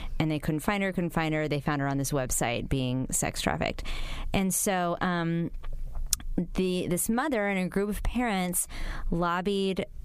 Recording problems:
squashed, flat; heavily

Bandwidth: 15 kHz